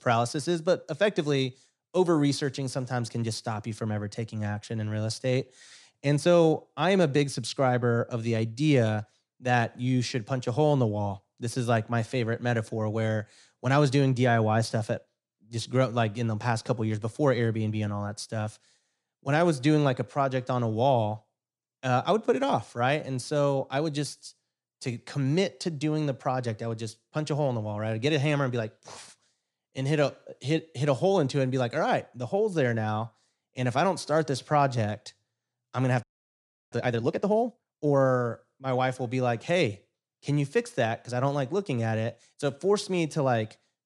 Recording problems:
audio freezing; at 36 s for 0.5 s

